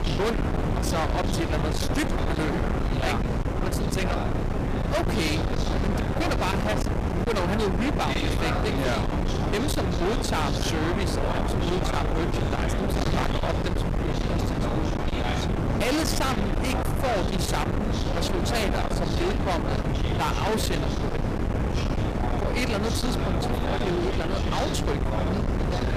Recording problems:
distortion; heavy; 48% of the sound clipped
wind noise on the microphone; heavy; 2 dB below the speech
background chatter; loud; throughout; 4 voices, 6 dB below the speech

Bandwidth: 15 kHz